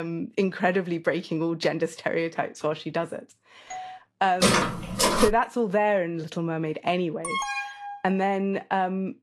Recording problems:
garbled, watery; slightly; nothing above 12 kHz
abrupt cut into speech; at the start
doorbell; faint; at 3.5 s; peak 10 dB below the speech
footsteps; loud; at 4.5 s; peak 5 dB above the speech
alarm; noticeable; at 7 s; peak 2 dB below the speech

